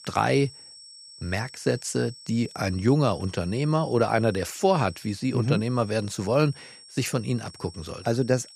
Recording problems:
high-pitched whine; noticeable; throughout; 5.5 kHz, 20 dB below the speech

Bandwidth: 15 kHz